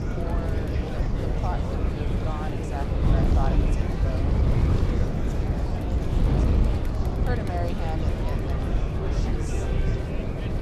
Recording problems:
murmuring crowd; very loud; throughout; 3 dB above the speech
wind noise on the microphone; heavy; 1 dB above the speech

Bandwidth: 13.5 kHz